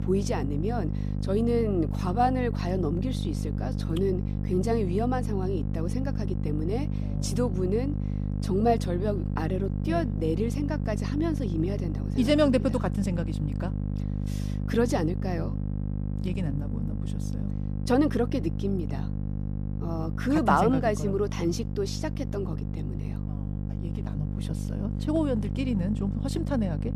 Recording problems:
electrical hum; noticeable; throughout; 50 Hz, 10 dB below the speech

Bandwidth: 14.5 kHz